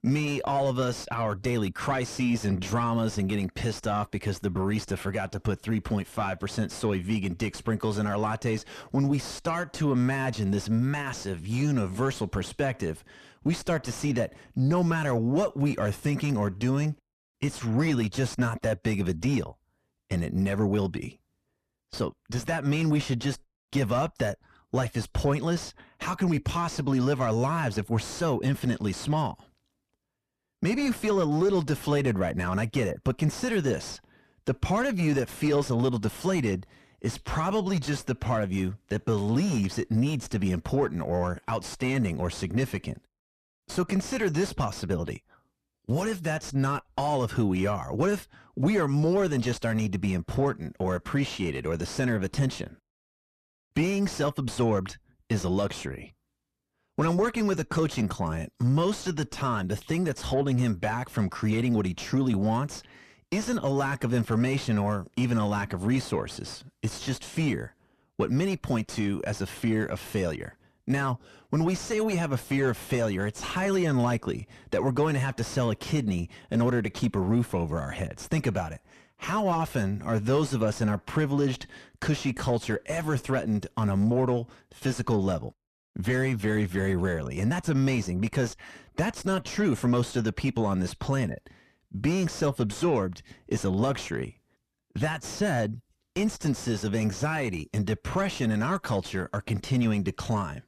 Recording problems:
distortion; slight; 10 dB below the speech

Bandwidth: 13.5 kHz